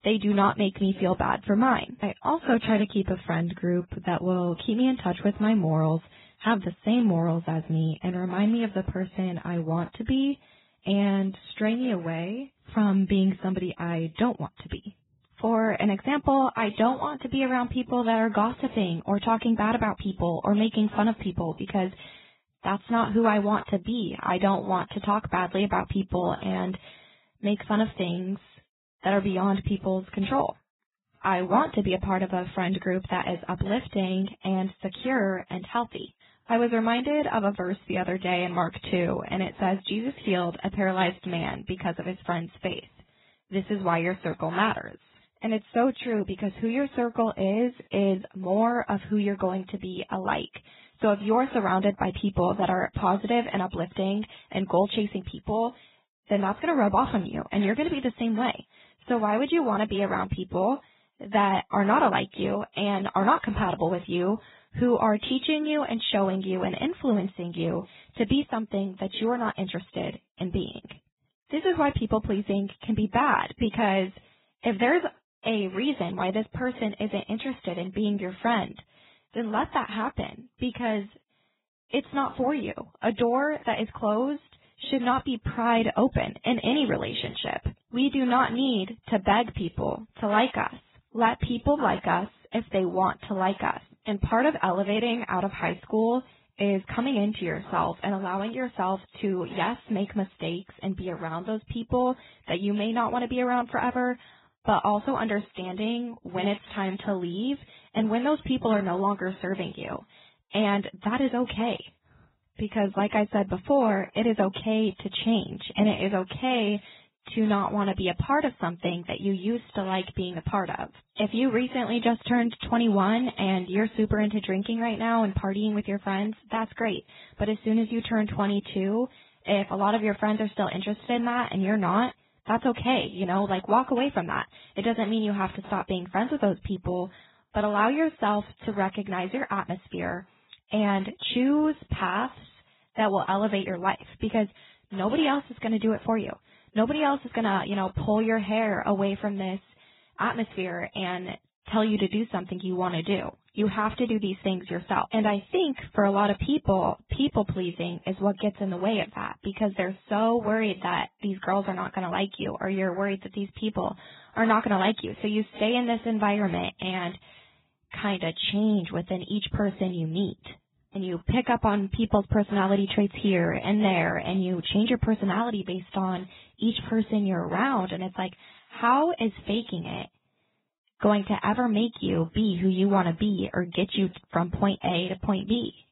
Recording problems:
garbled, watery; badly; nothing above 4 kHz

